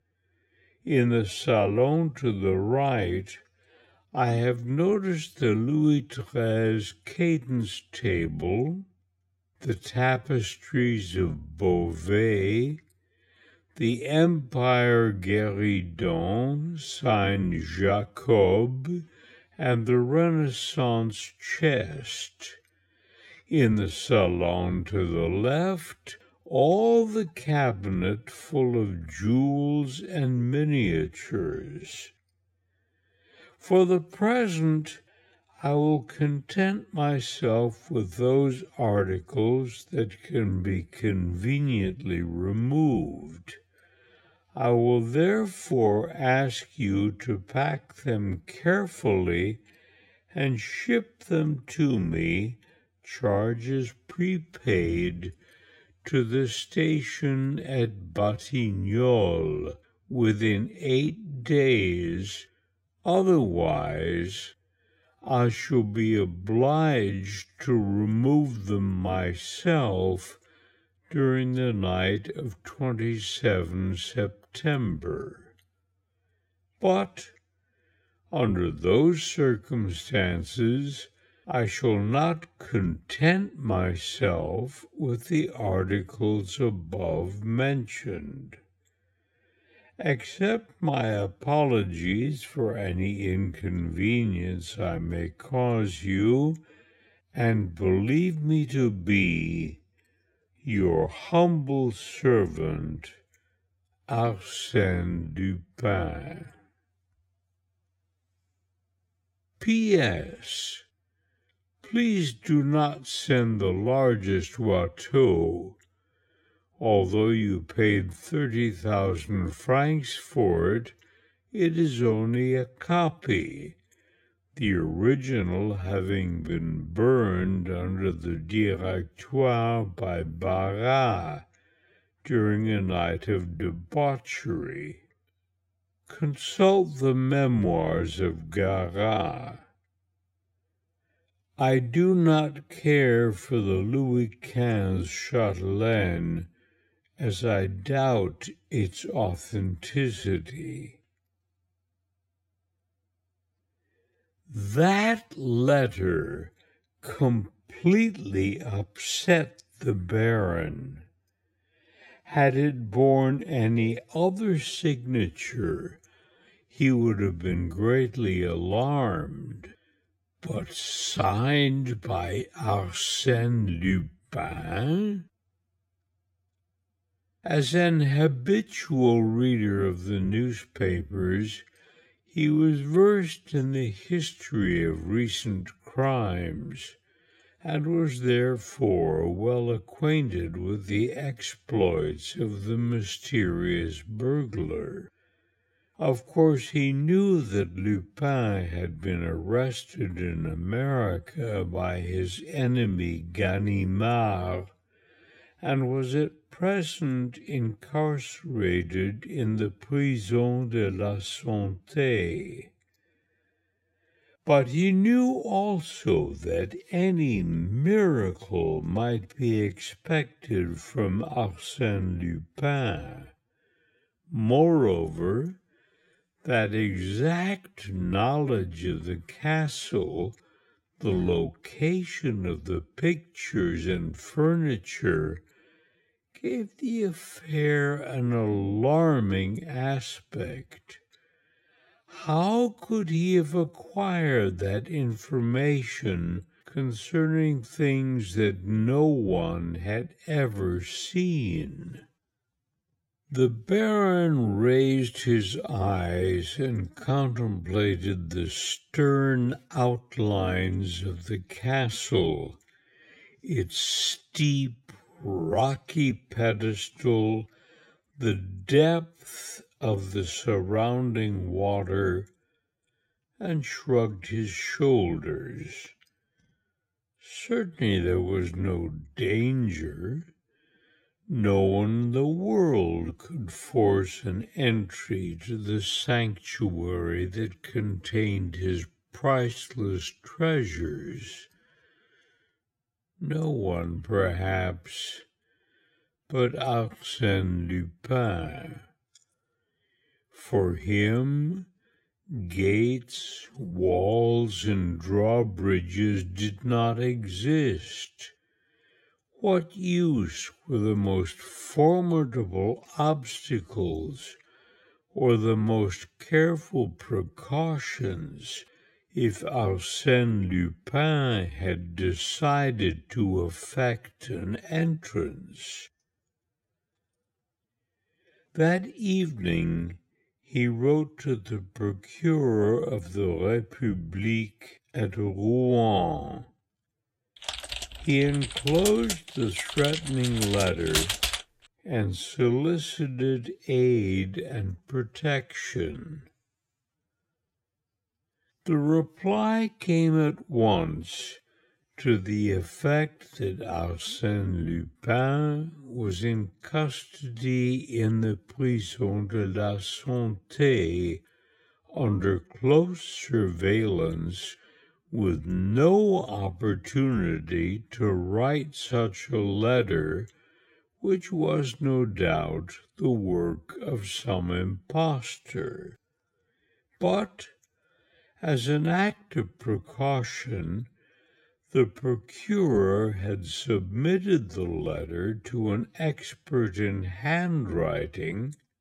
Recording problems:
wrong speed, natural pitch; too slow; 0.5 times normal speed
keyboard typing; loud; from 5:37 to 5:41; peak 2 dB above the speech

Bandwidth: 16 kHz